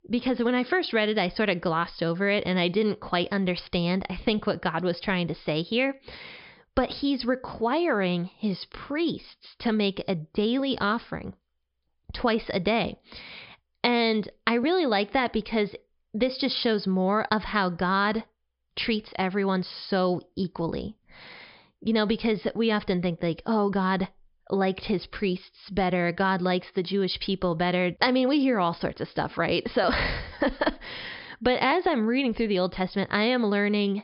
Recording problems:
high frequencies cut off; noticeable; nothing above 5.5 kHz

